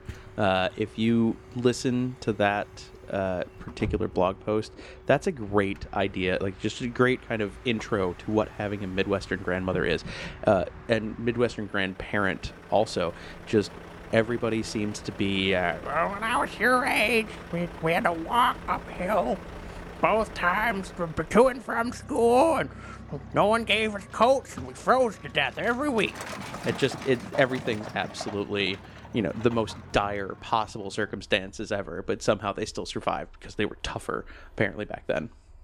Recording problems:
traffic noise; noticeable; throughout; 15 dB below the speech

